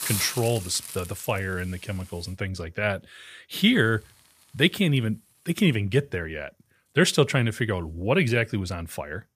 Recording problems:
hiss; loud; until 2.5 s, from 3.5 to 6 s and from 6.5 s on; 10 dB below the speech

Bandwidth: 15 kHz